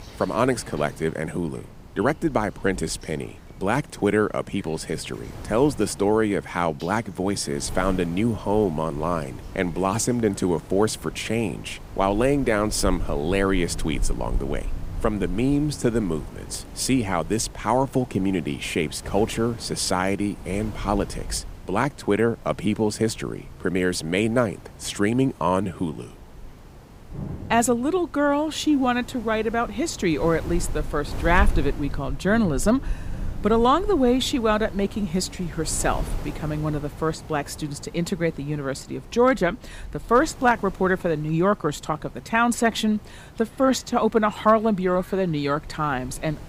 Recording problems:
wind noise on the microphone; occasional gusts; 20 dB below the speech
rain or running water; faint; throughout; 20 dB below the speech

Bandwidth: 15.5 kHz